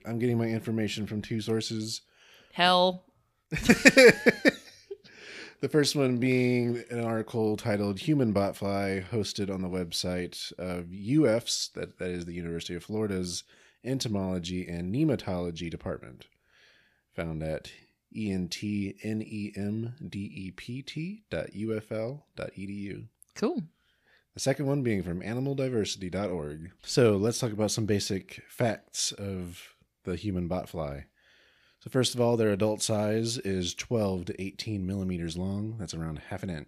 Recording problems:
none

